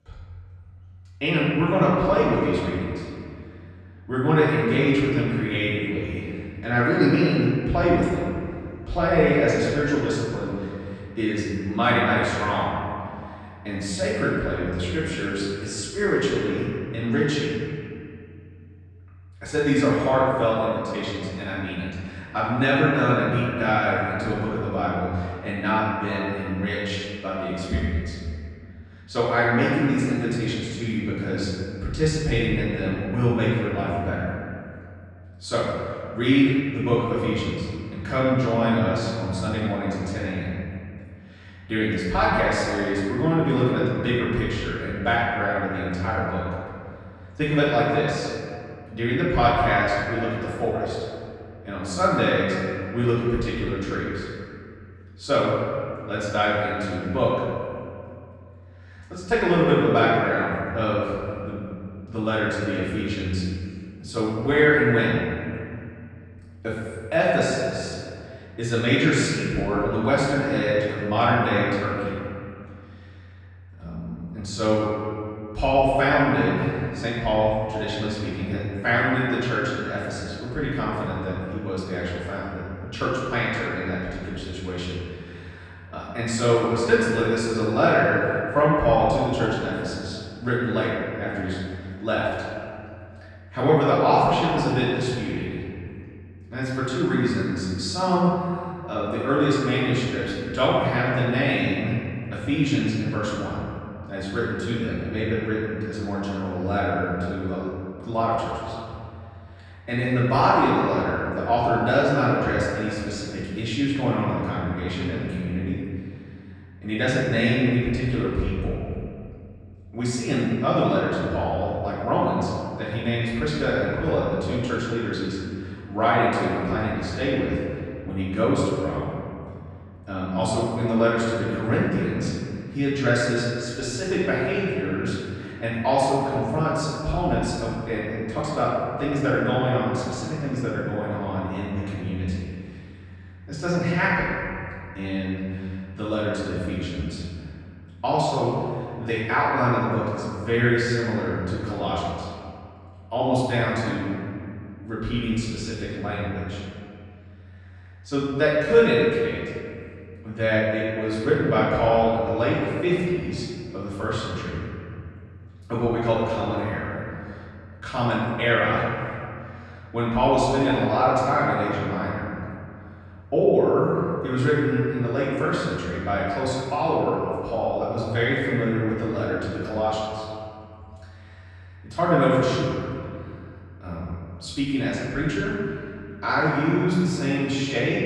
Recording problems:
room echo; strong; dies away in 2.1 s
off-mic speech; far

